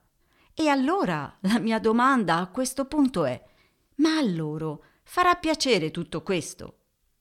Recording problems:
none

